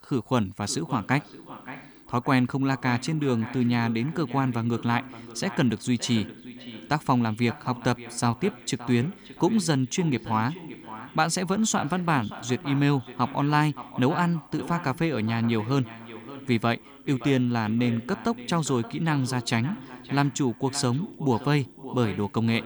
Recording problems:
echo of what is said; noticeable; throughout; 570 ms later, 15 dB below the speech

